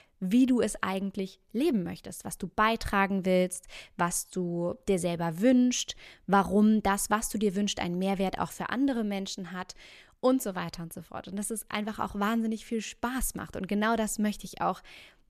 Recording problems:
none

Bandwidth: 14.5 kHz